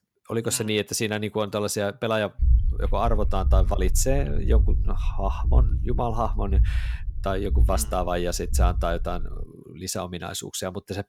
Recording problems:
low rumble; noticeable; from 2.5 to 9.5 s; 20 dB below the speech

